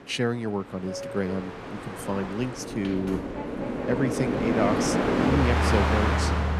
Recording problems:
train or aircraft noise; very loud; throughout; 3 dB above the speech

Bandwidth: 14 kHz